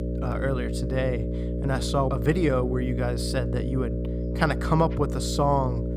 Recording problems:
electrical hum; loud; throughout; 60 Hz, 8 dB below the speech

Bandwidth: 15.5 kHz